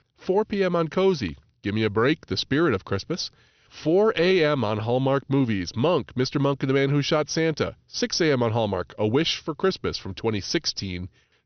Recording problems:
high frequencies cut off; noticeable; nothing above 6 kHz

